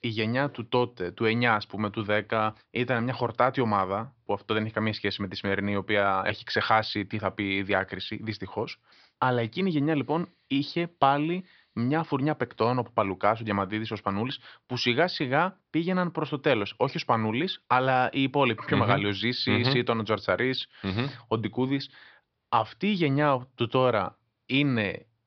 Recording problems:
high frequencies cut off; noticeable; nothing above 5.5 kHz

